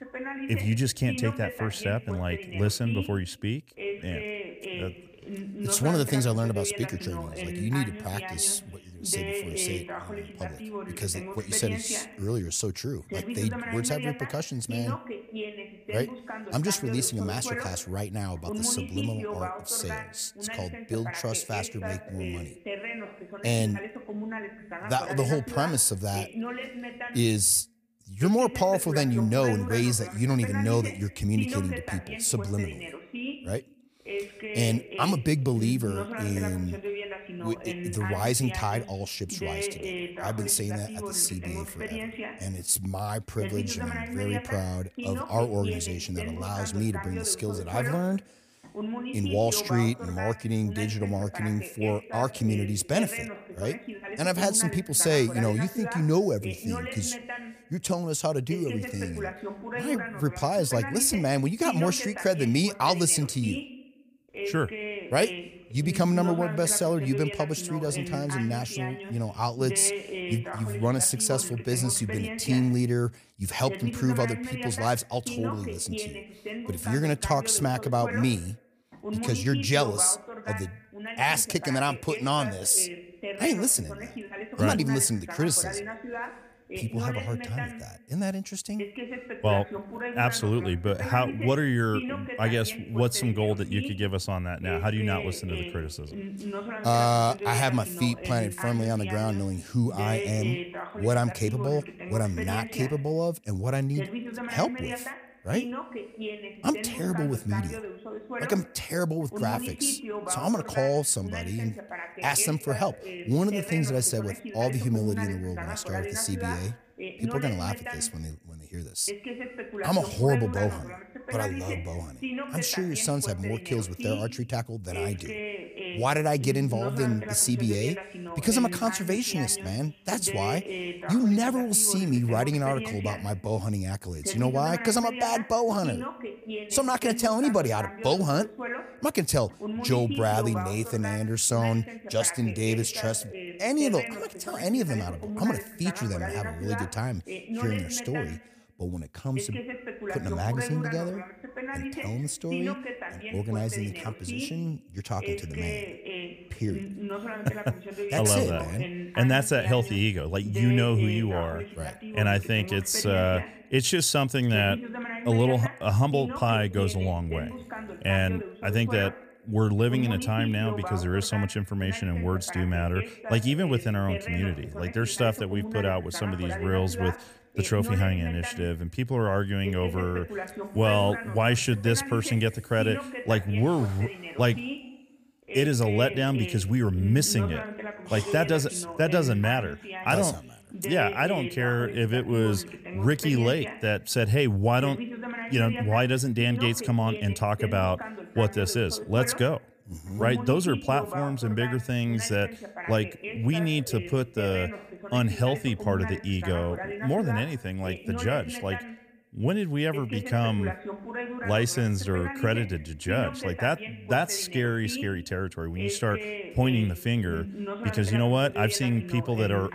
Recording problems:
voice in the background; loud; throughout; 9 dB below the speech

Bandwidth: 15 kHz